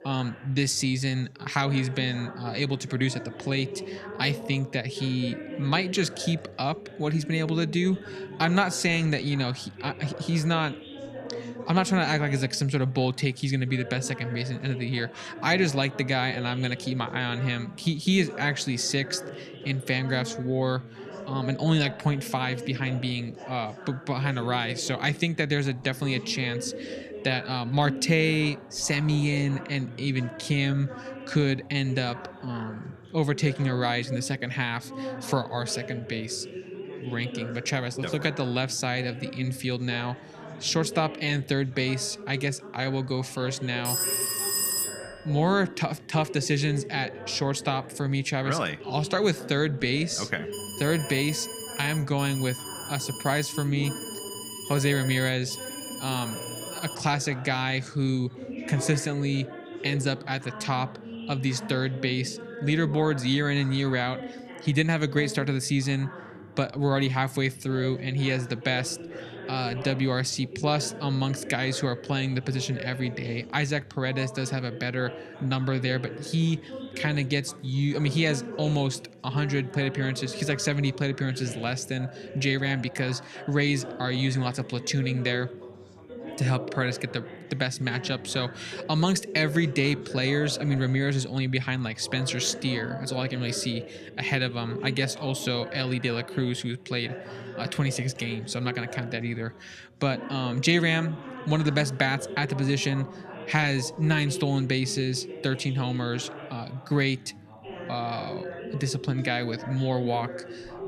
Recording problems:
background chatter; noticeable; throughout; 4 voices, 10 dB below the speech
phone ringing; loud; from 44 to 45 s; peak 4 dB above the speech
alarm; noticeable; from 51 to 57 s; peak 8 dB below the speech

